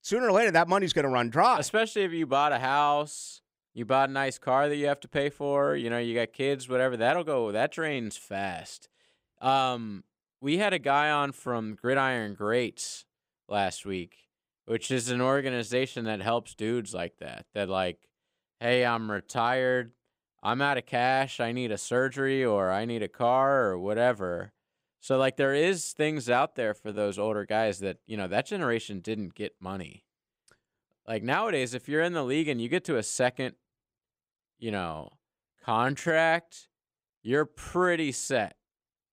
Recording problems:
uneven, jittery; strongly; from 8 to 36 s

